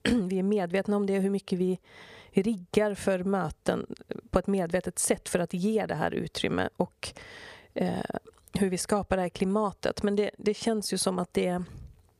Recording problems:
squashed, flat; somewhat

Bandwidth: 15 kHz